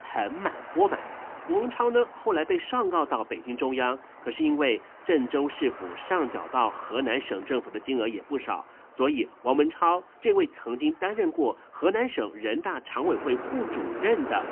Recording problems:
phone-call audio; poor line; nothing above 3 kHz
traffic noise; noticeable; throughout; 15 dB below the speech
jangling keys; very faint; from 5.5 to 7.5 s; peak 40 dB below the speech

